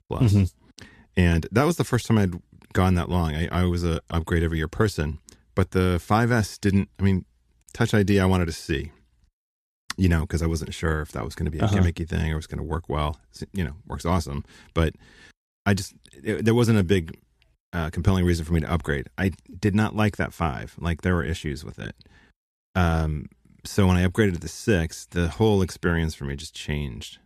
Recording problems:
none

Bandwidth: 14 kHz